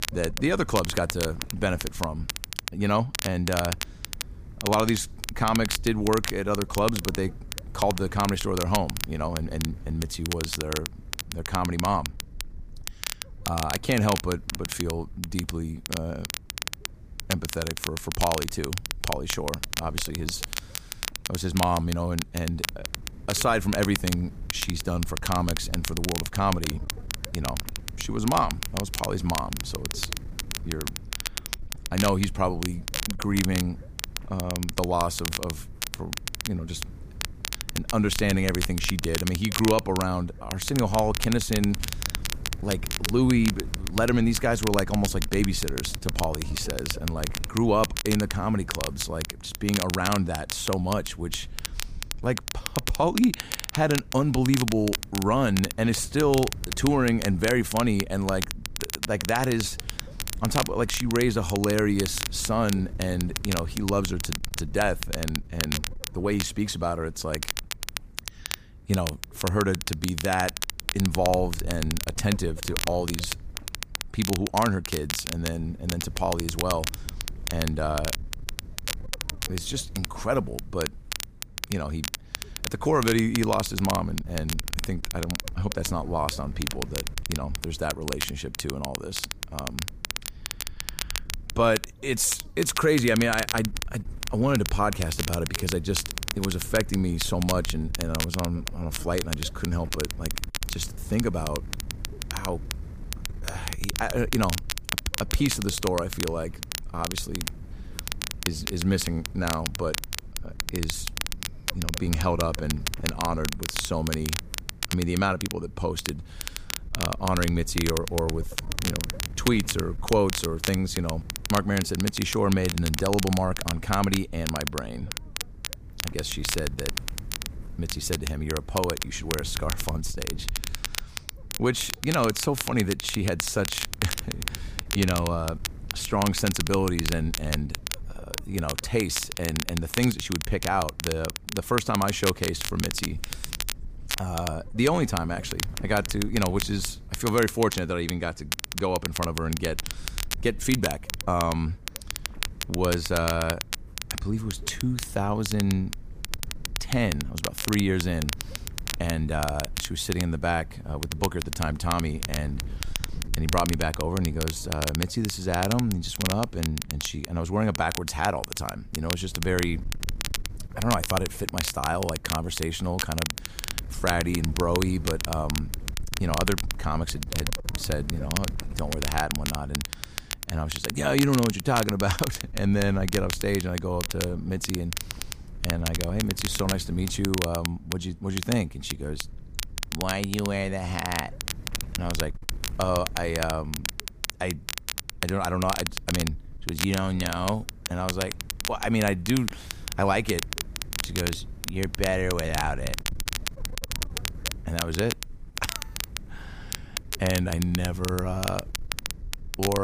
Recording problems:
crackle, like an old record; loud; 5 dB below the speech
wind noise on the microphone; occasional gusts; 25 dB below the speech
abrupt cut into speech; at the end

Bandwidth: 15 kHz